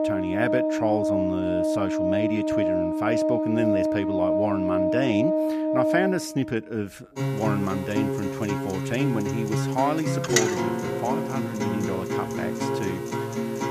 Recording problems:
background music; very loud; throughout; 3 dB above the speech

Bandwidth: 14.5 kHz